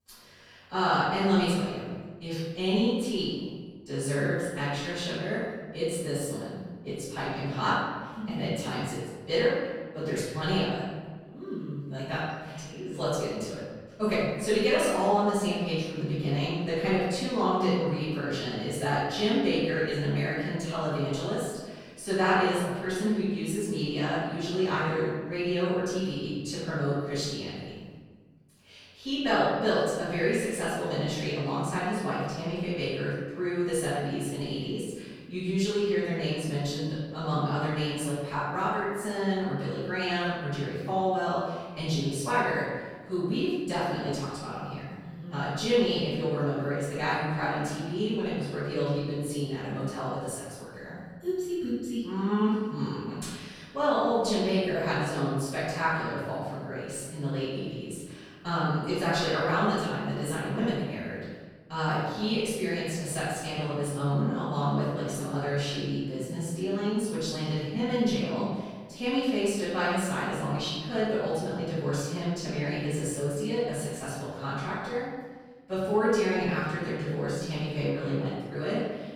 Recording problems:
room echo; strong; dies away in 1.3 s
off-mic speech; far

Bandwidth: 19 kHz